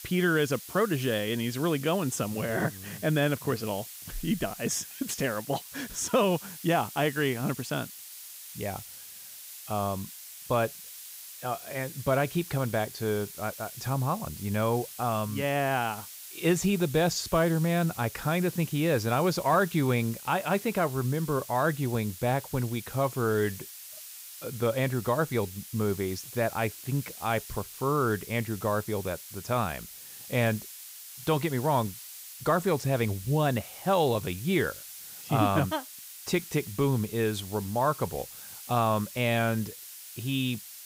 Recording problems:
hiss; noticeable; throughout; 15 dB below the speech

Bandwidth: 15.5 kHz